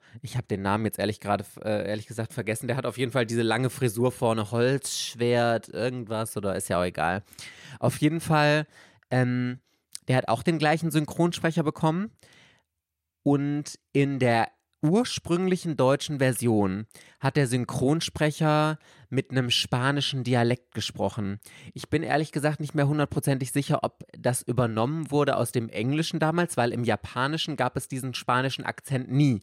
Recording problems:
none

